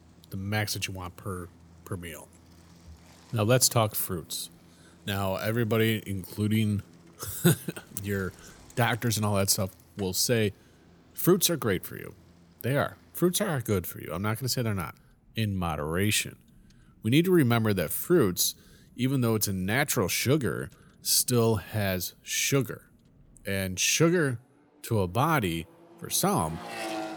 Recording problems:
traffic noise; faint; throughout; 25 dB below the speech

